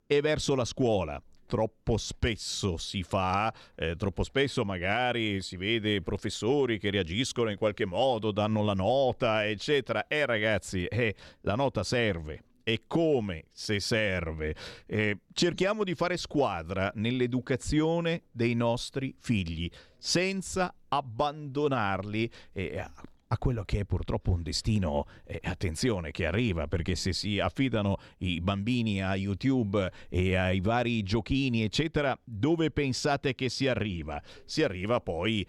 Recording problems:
none

